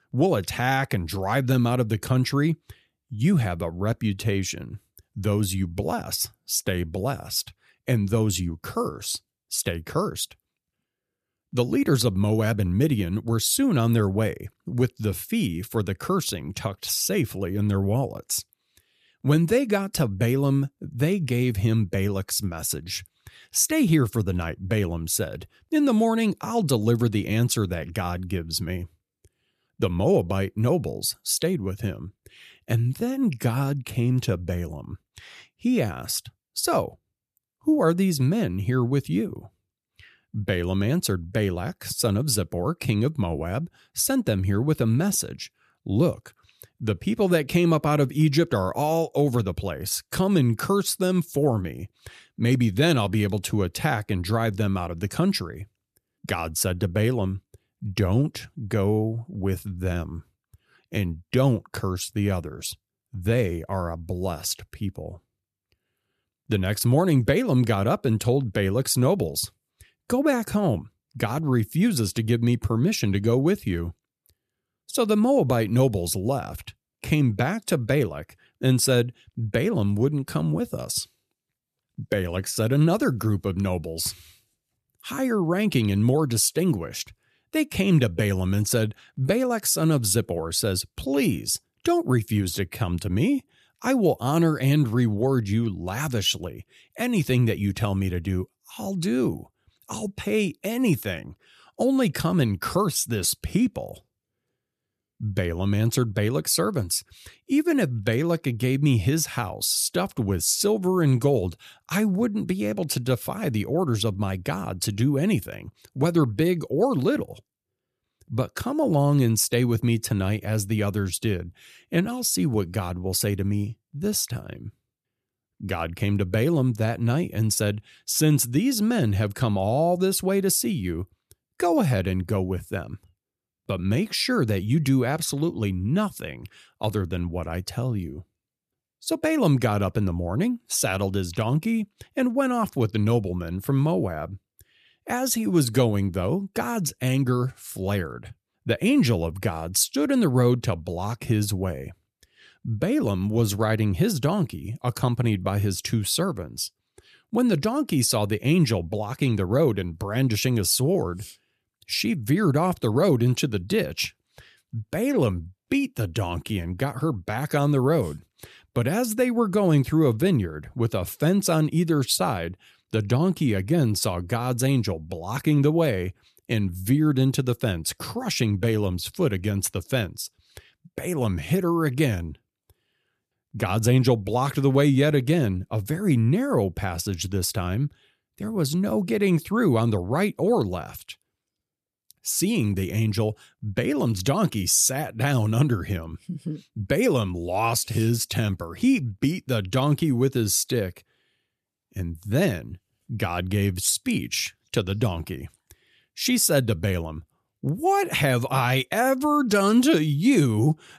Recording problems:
none

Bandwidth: 14.5 kHz